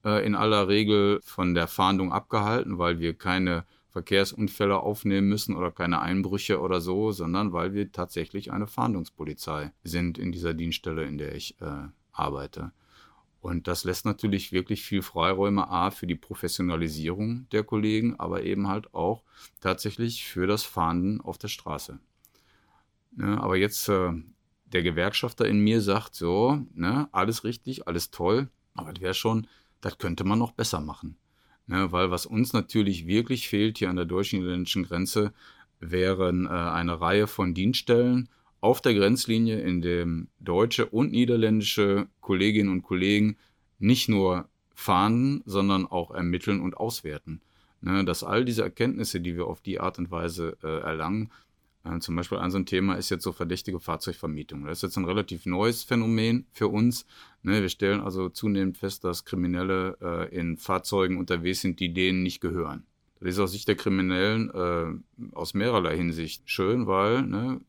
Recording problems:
none

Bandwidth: 18.5 kHz